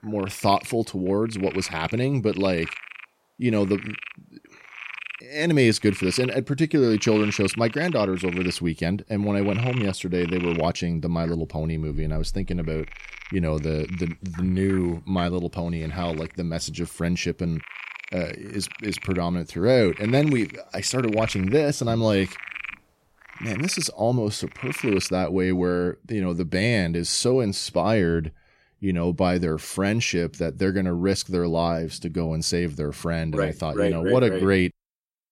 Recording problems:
animal sounds; noticeable; until 25 s; 10 dB below the speech

